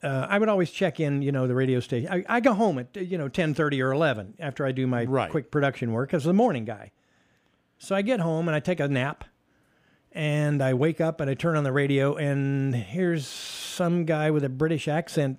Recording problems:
none

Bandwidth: 15 kHz